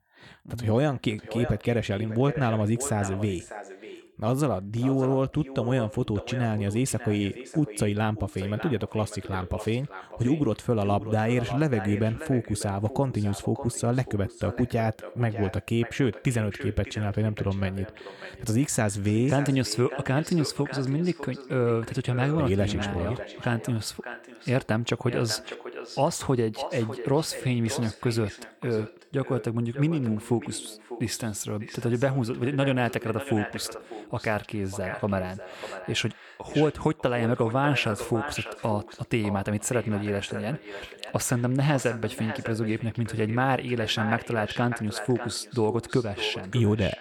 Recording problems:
echo of what is said; noticeable; throughout; 600 ms later, 10 dB below the speech

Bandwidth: 18.5 kHz